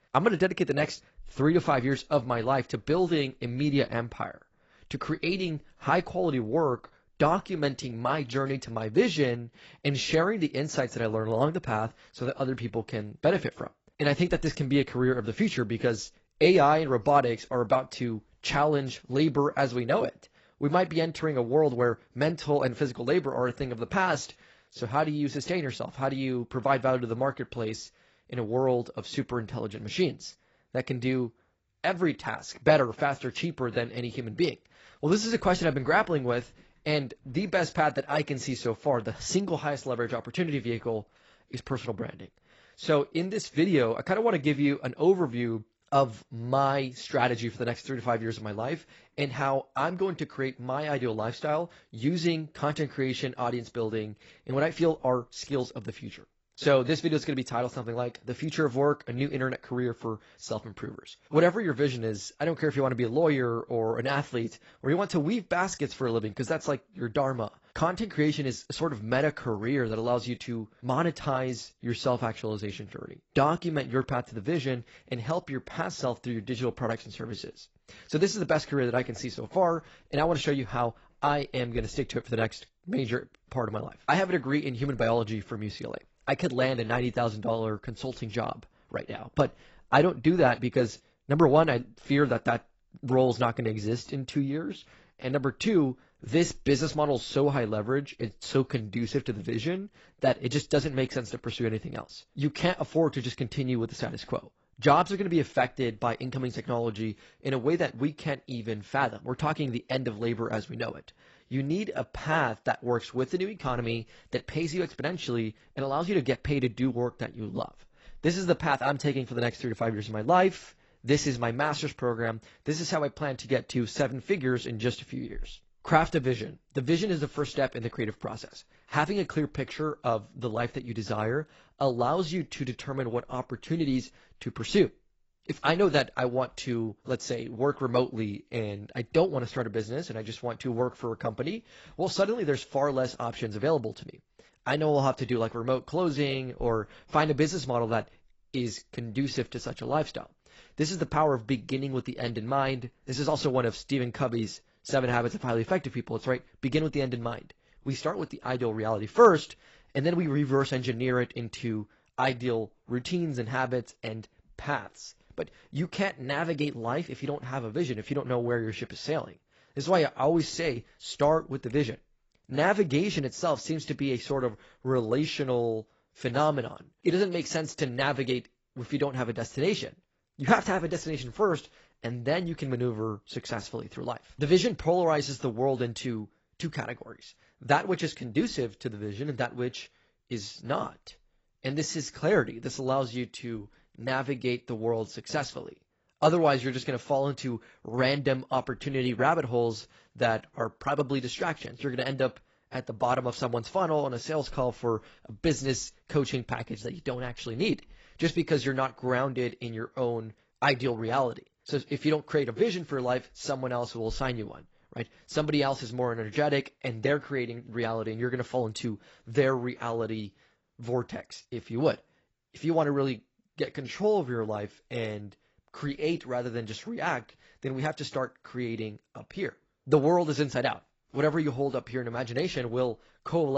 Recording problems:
garbled, watery; badly; nothing above 7.5 kHz
abrupt cut into speech; at the end

